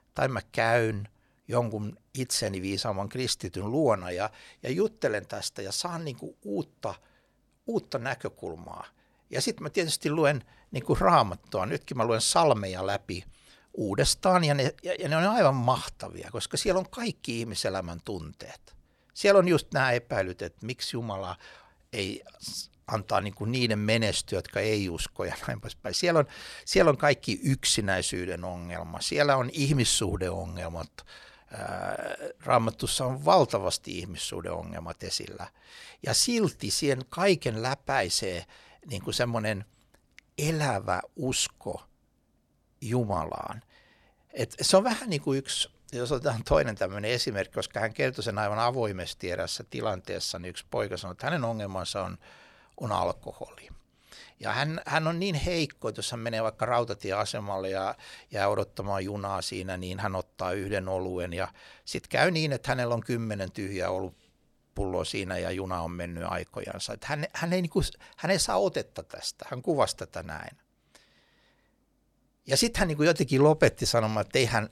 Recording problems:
none

